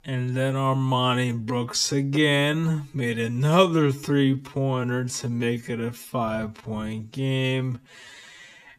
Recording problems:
wrong speed, natural pitch; too slow; 0.5 times normal speed

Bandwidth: 14.5 kHz